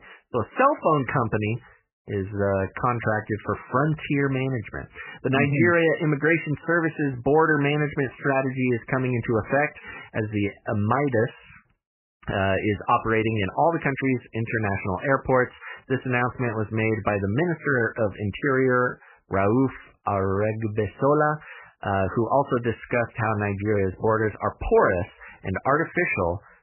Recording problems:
garbled, watery; badly; nothing above 3 kHz

